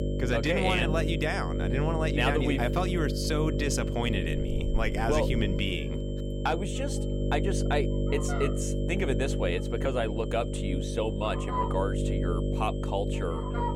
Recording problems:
electrical hum; loud; throughout; 50 Hz, 6 dB below the speech
animal sounds; loud; throughout; 9 dB below the speech
high-pitched whine; noticeable; throughout; 3 kHz, 20 dB below the speech

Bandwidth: 16.5 kHz